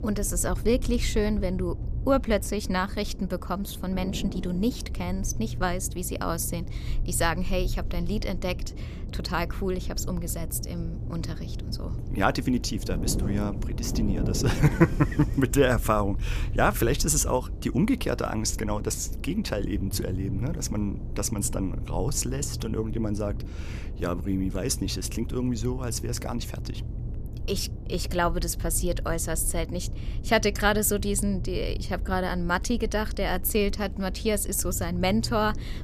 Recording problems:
wind noise on the microphone; occasional gusts; 15 dB below the speech
low rumble; faint; throughout; 25 dB below the speech

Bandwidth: 14.5 kHz